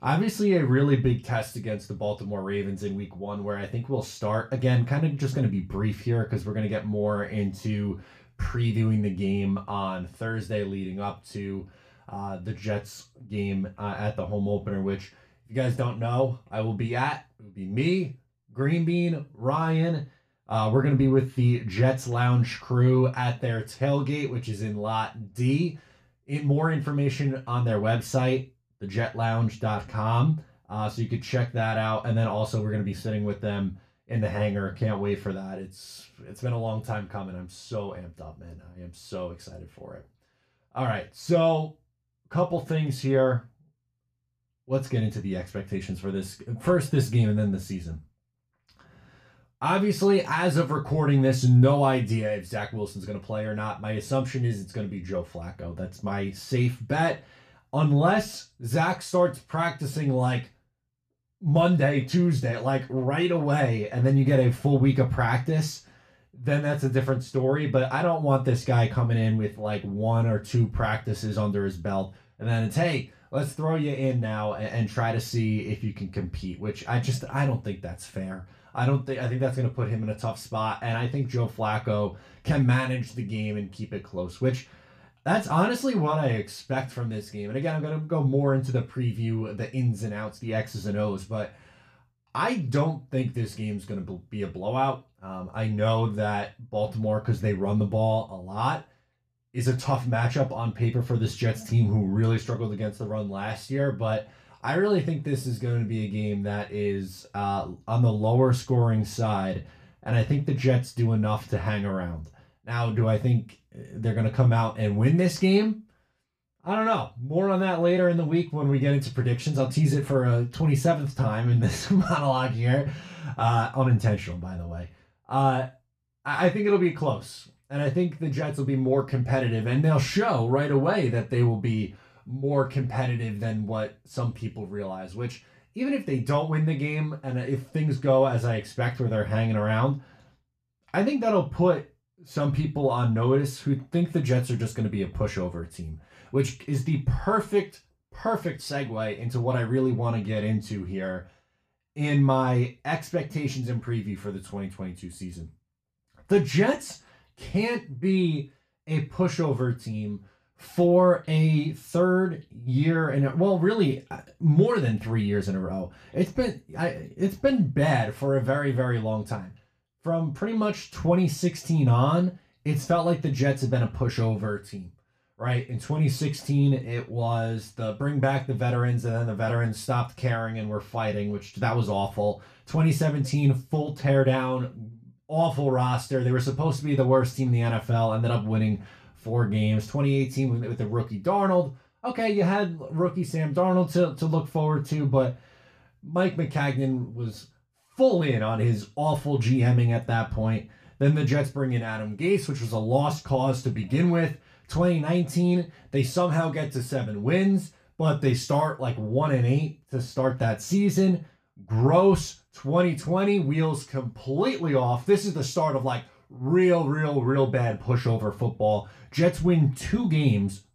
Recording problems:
off-mic speech; far
room echo; very slight; dies away in 0.2 s

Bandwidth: 14.5 kHz